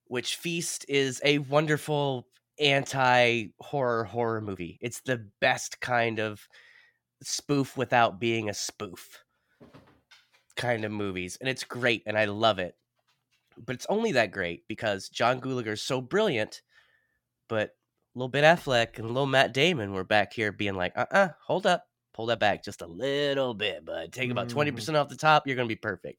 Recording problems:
uneven, jittery; strongly; from 1 to 25 s

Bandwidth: 17 kHz